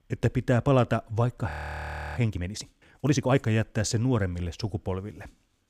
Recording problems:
audio freezing; at 1.5 s for 0.5 s

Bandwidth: 15 kHz